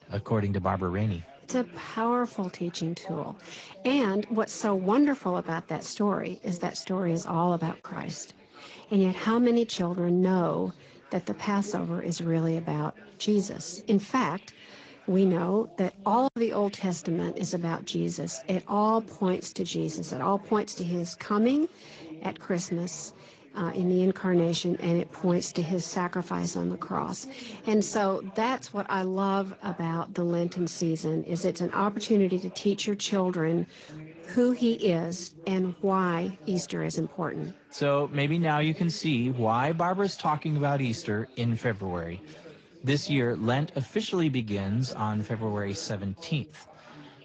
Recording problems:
garbled, watery; slightly; nothing above 7.5 kHz
background chatter; faint; throughout; 4 voices, 20 dB below the speech
choppy; occasionally; at 8 s and at 16 s; 2% of the speech affected

